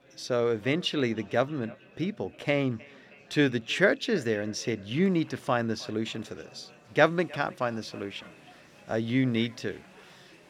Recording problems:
echo of what is said; faint; throughout; 310 ms later, 25 dB below the speech
murmuring crowd; faint; throughout; 25 dB below the speech

